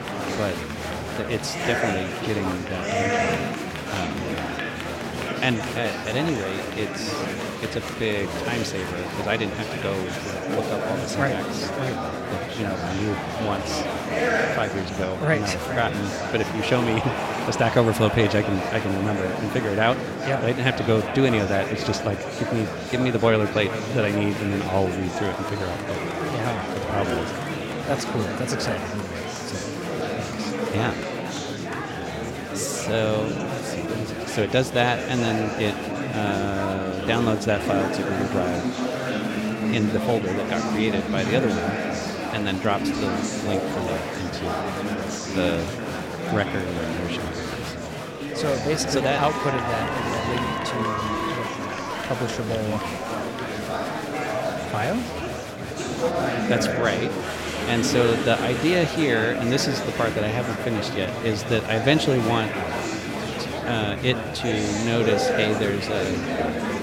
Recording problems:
echo of what is said; strong; throughout; 410 ms later, 10 dB below the speech
murmuring crowd; loud; throughout; 2 dB below the speech

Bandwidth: 16 kHz